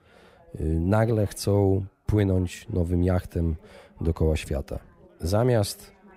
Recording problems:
background chatter; faint; throughout; 4 voices, 30 dB below the speech

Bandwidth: 15.5 kHz